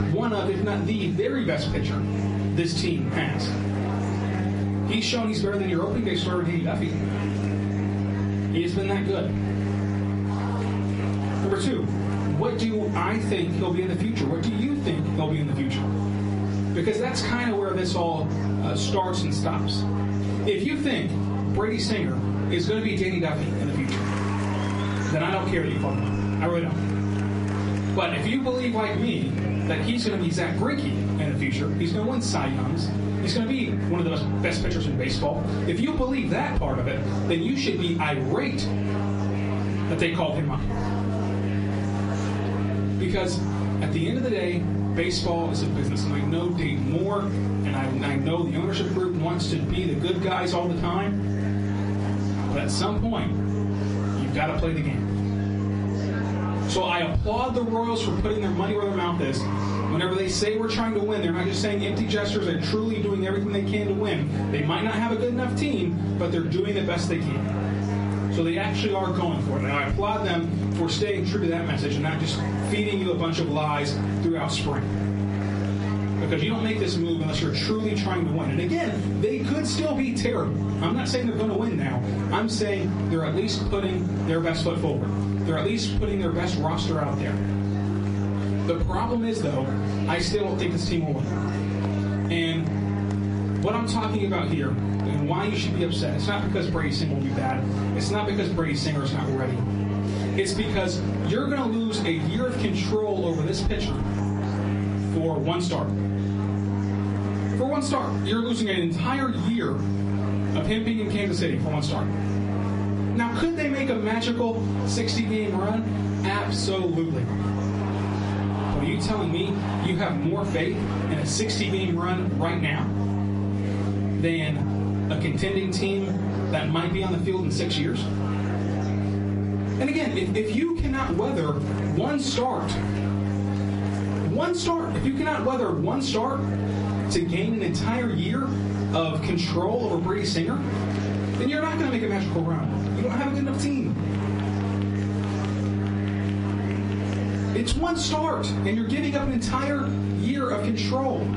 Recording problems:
off-mic speech; far
room echo; slight; dies away in 0.4 s
garbled, watery; slightly; nothing above 10.5 kHz
squashed, flat; somewhat
electrical hum; loud; throughout; 50 Hz, 9 dB below the speech
murmuring crowd; noticeable; throughout; 10 dB below the speech

